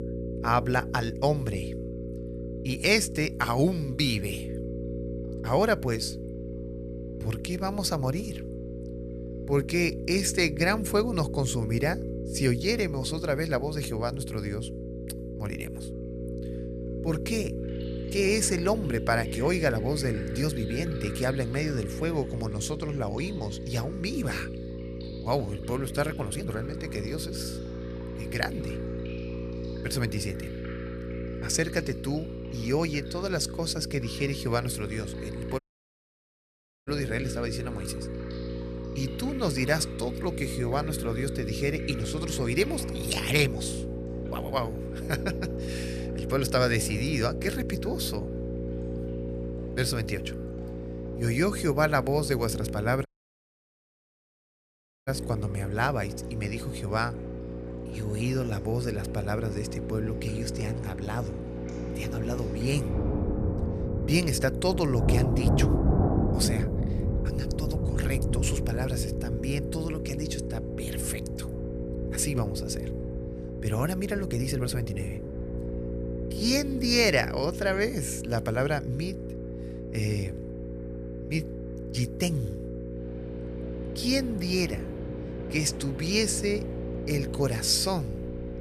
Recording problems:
electrical hum; loud; throughout; 60 Hz, 9 dB below the speech
rain or running water; loud; throughout; 7 dB below the speech
uneven, jittery; strongly; from 25 s to 1:15
audio cutting out; at 36 s for 1.5 s and at 53 s for 2 s

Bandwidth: 14.5 kHz